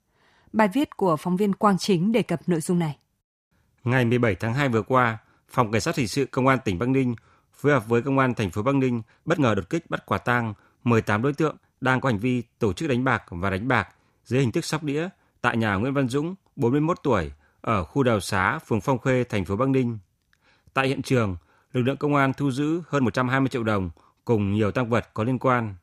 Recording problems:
uneven, jittery; strongly; from 9 to 23 s

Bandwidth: 15 kHz